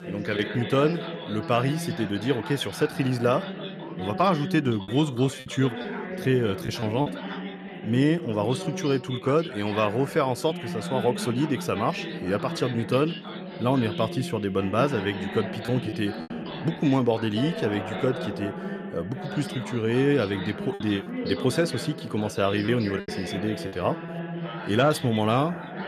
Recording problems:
background chatter; loud; throughout; 3 voices, 8 dB below the speech
choppy; very; from 5 to 7 s and from 21 to 24 s; 6% of the speech affected

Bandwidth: 13.5 kHz